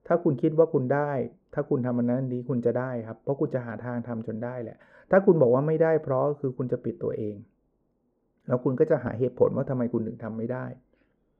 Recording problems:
muffled; very; fading above 2 kHz

